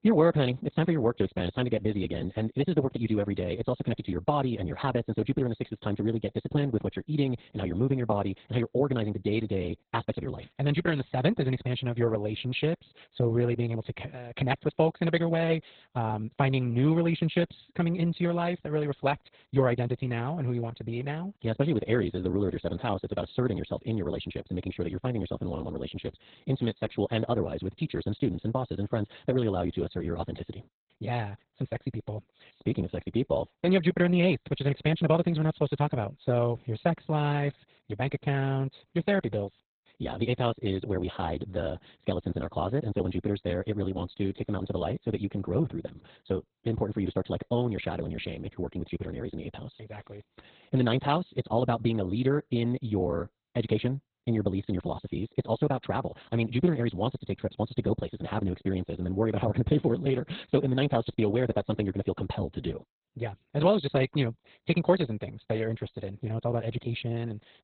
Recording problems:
garbled, watery; badly; nothing above 4 kHz
wrong speed, natural pitch; too fast; 1.6 times normal speed

